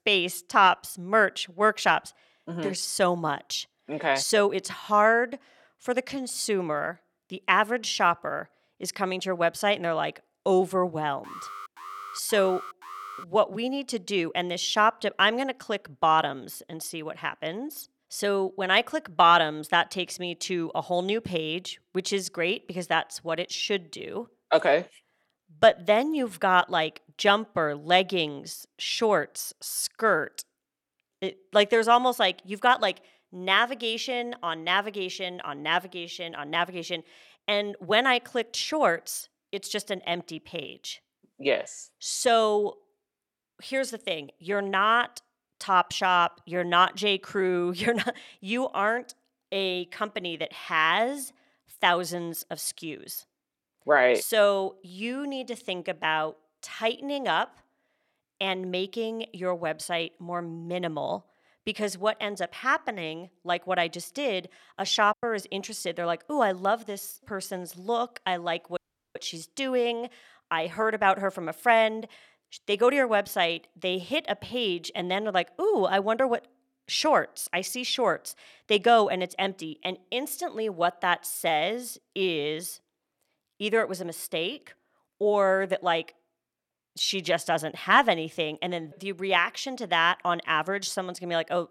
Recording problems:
alarm; faint; from 11 to 13 s; peak 15 dB below the speech
audio cutting out; at 1:09

